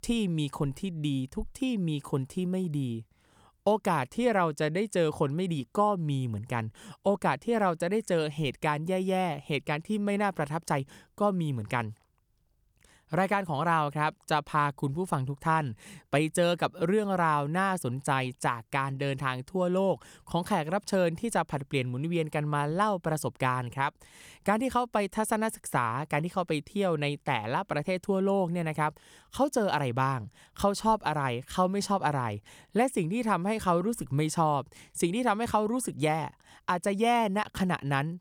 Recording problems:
none

